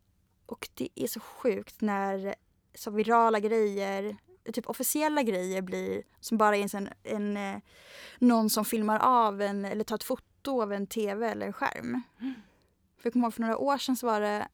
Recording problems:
none

